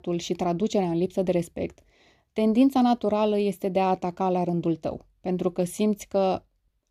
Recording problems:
none

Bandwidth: 14.5 kHz